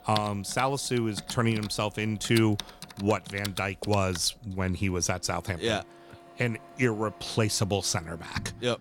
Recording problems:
household noises; noticeable; throughout; 15 dB below the speech

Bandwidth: 18.5 kHz